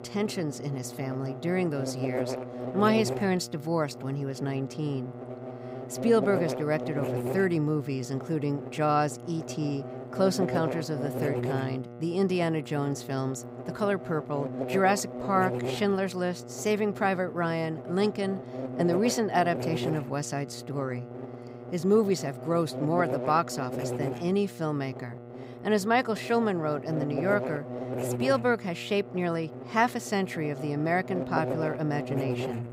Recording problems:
electrical hum; loud; throughout; 60 Hz, 8 dB below the speech

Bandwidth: 15.5 kHz